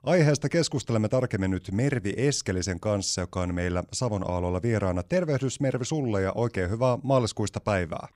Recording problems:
none

